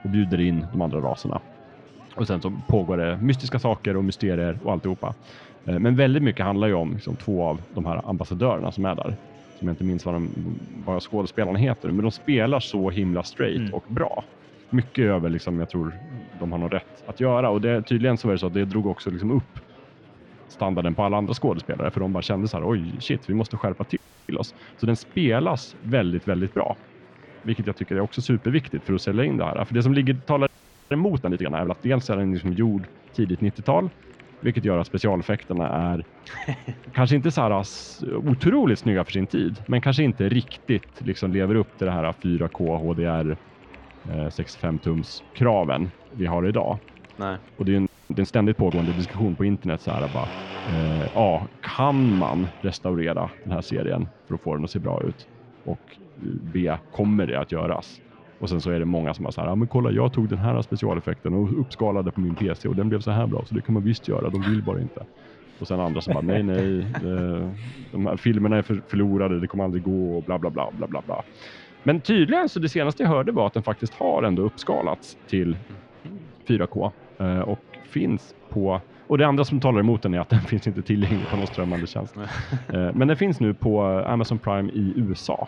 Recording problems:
muffled; slightly; fading above 3.5 kHz
household noises; faint; throughout; 20 dB below the speech
murmuring crowd; faint; throughout; 25 dB below the speech
audio freezing; at 24 s, at 30 s and at 48 s

